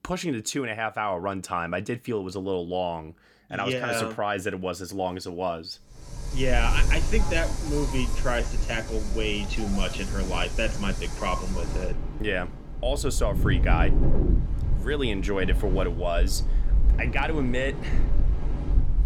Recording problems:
wind in the background; very loud; from 6.5 s on; as loud as the speech

